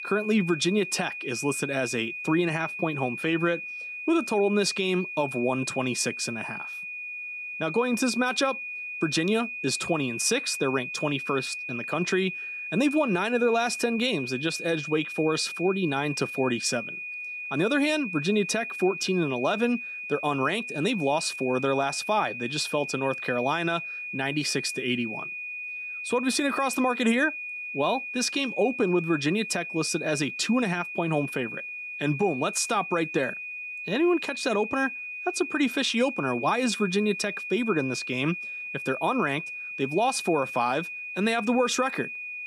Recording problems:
high-pitched whine; loud; throughout; 2.5 kHz, 7 dB below the speech

